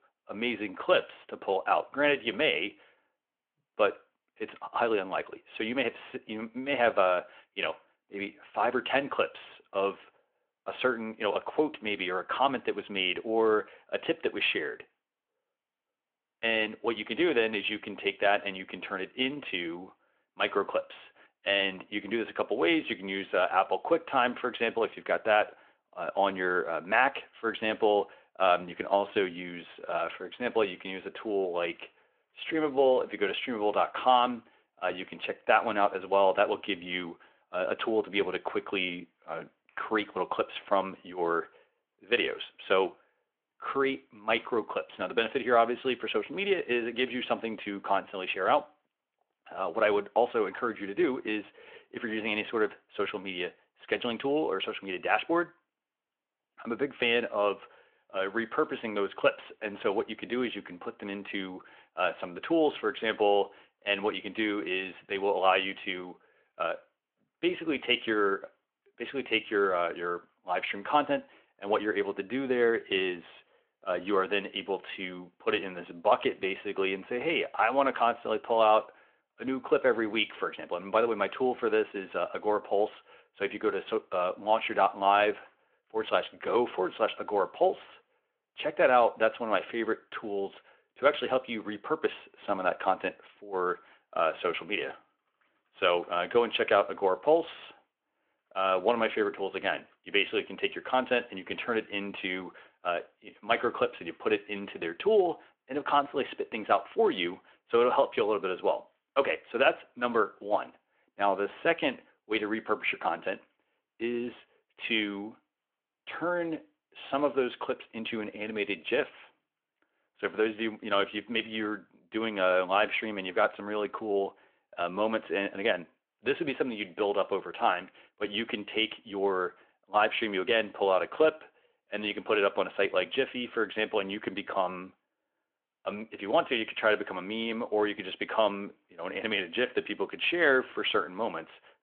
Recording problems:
phone-call audio; nothing above 3.5 kHz

